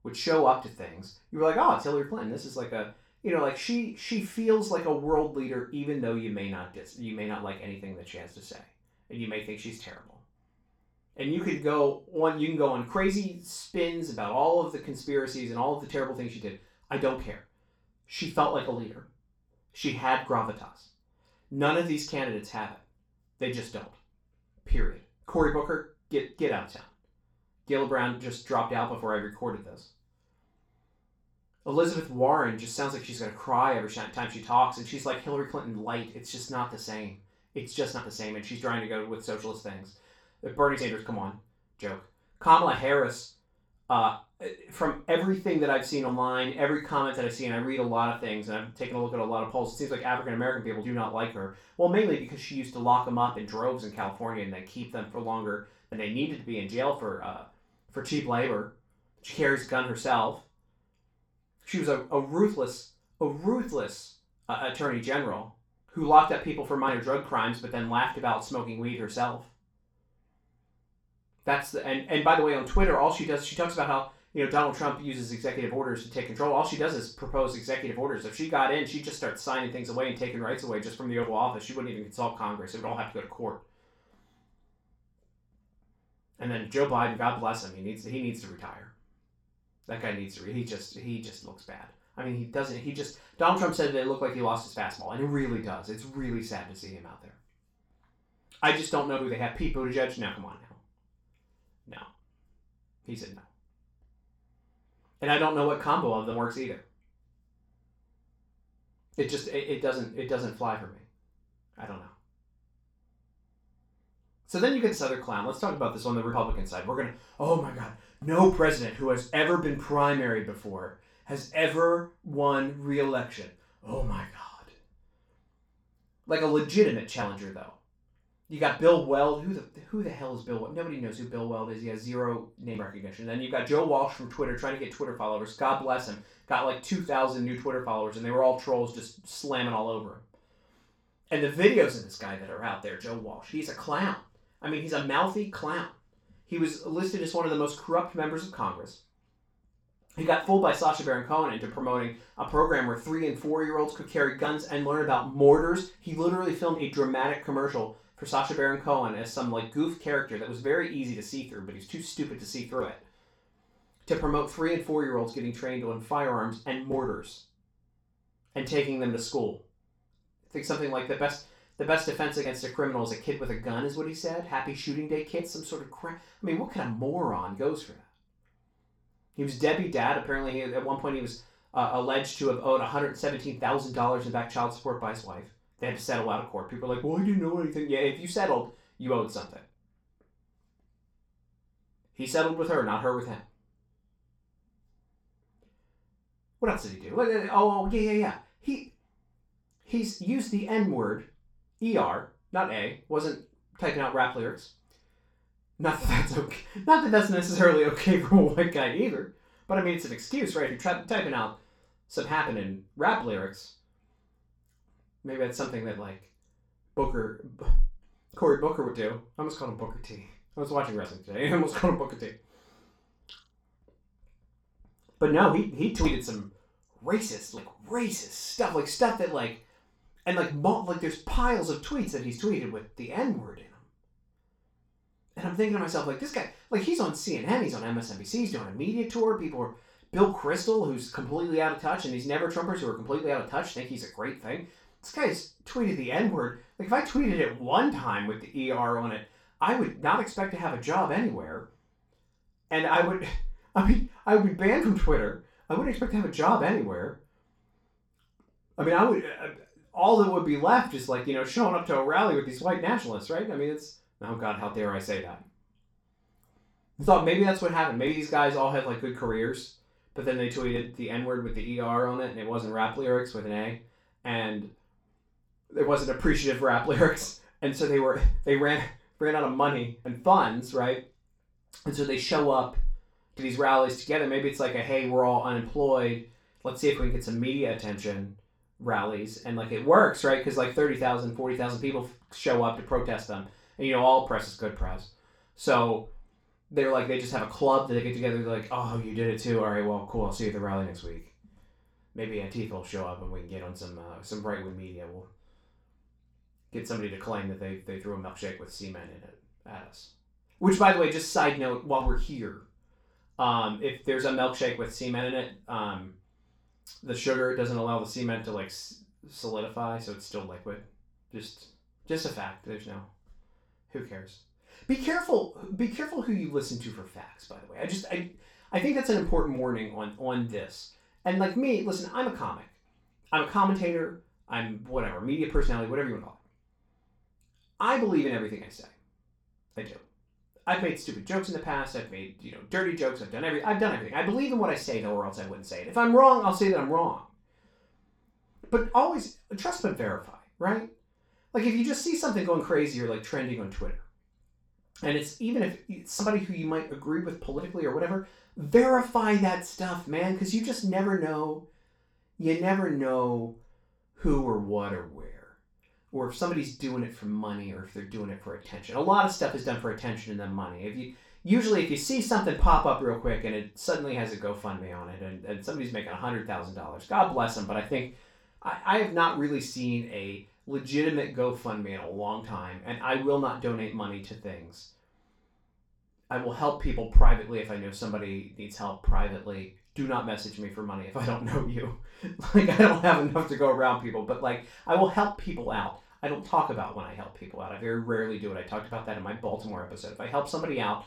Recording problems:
off-mic speech; far
room echo; noticeable; dies away in 0.3 s

